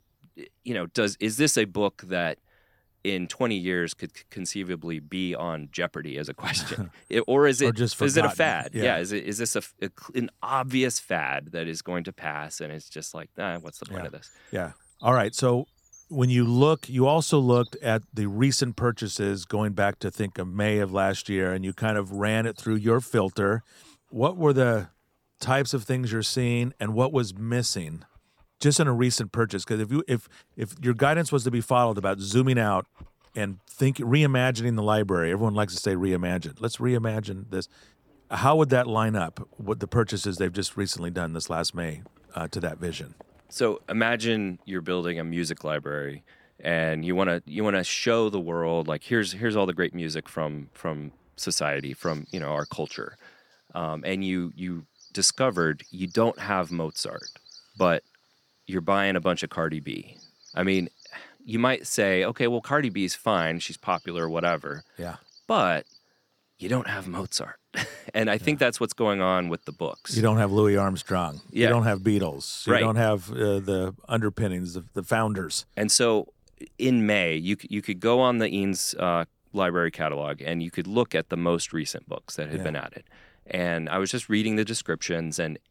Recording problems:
animal sounds; faint; throughout; 25 dB below the speech

